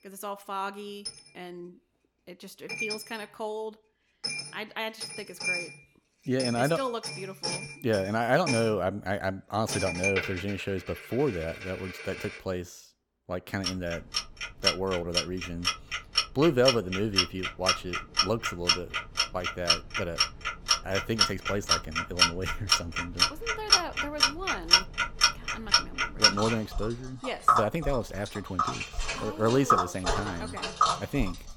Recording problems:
household noises; very loud; throughout; 4 dB above the speech

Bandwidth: 17.5 kHz